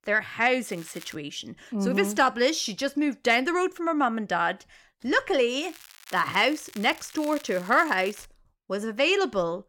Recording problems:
crackling; faint; at 0.5 s and from 5.5 to 8.5 s; 20 dB below the speech

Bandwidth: 17 kHz